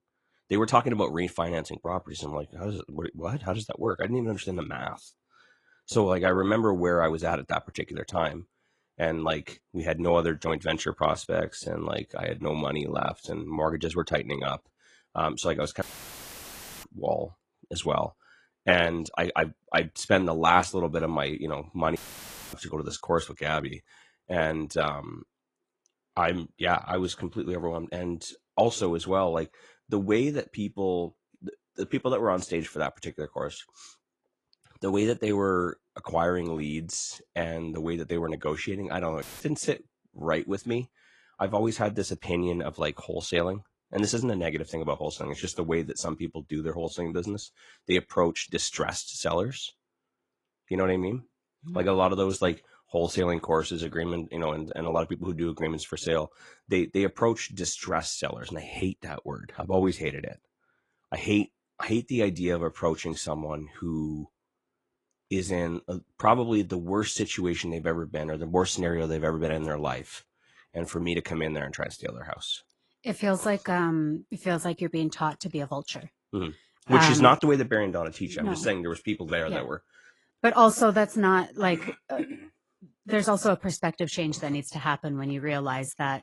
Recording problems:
garbled, watery; slightly; nothing above 11.5 kHz
audio cutting out; filled with static; at 16 s for 1 s, at 22 s for 0.5 s and at 39 s

